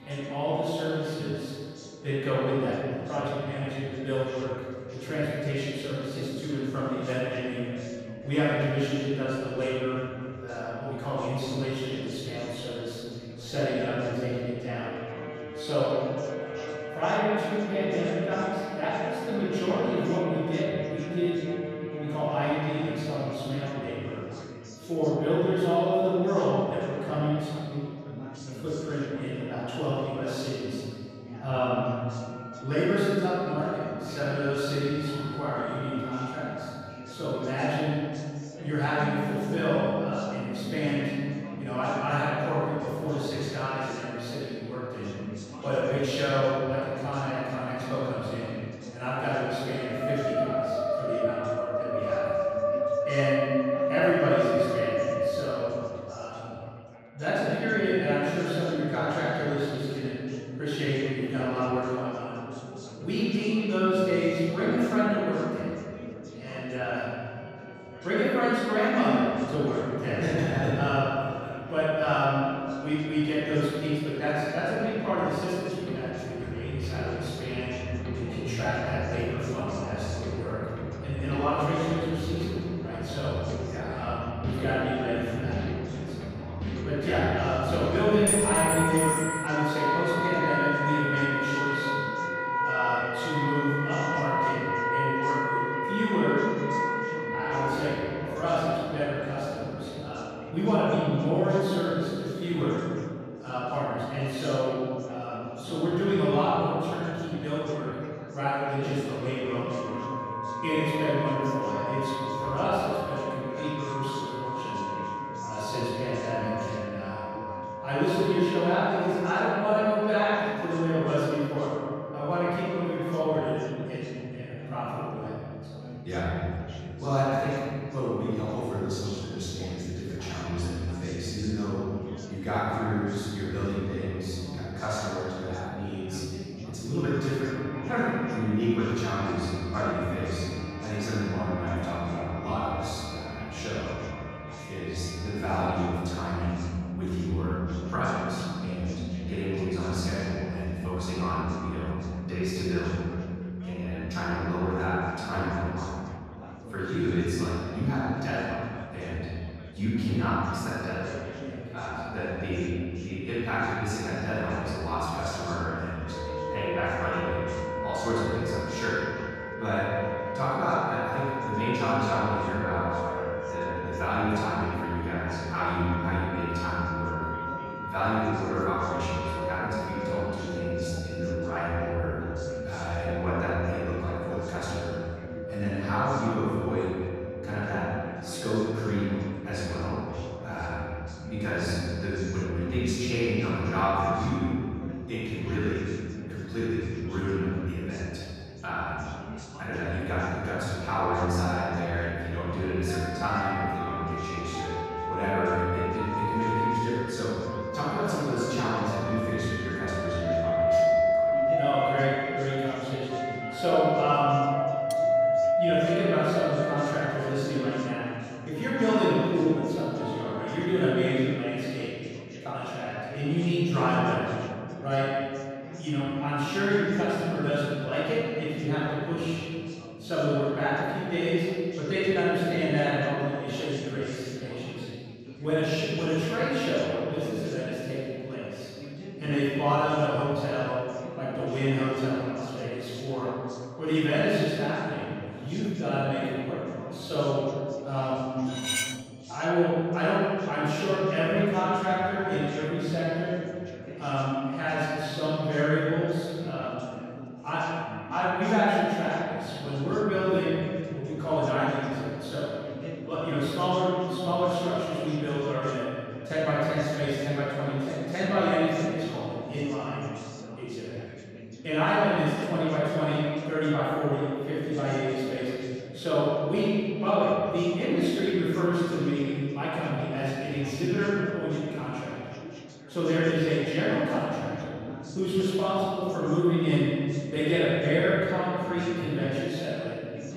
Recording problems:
room echo; strong; dies away in 2 s
off-mic speech; far
background music; loud; until 3:41; 4 dB below the speech
chatter from many people; noticeable; throughout; 15 dB below the speech
clattering dishes; loud; from 1:28 to 1:29 and at 4:08; peak 5 dB above the speech
clattering dishes; faint; at 3:35; peak 15 dB below the speech

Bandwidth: 15.5 kHz